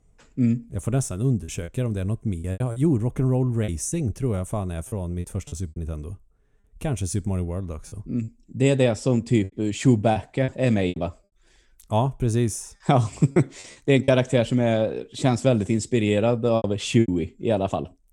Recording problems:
choppy; very; 7% of the speech affected

